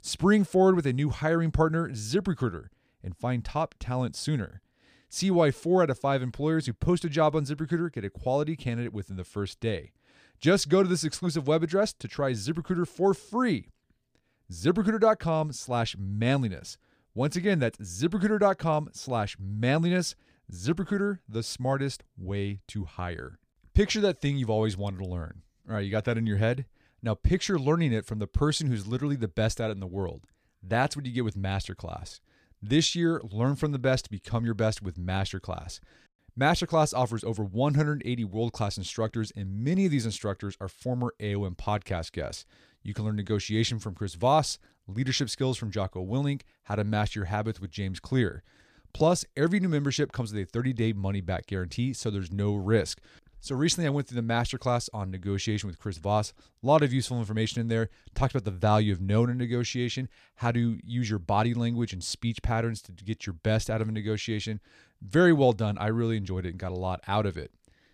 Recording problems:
none

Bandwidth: 15 kHz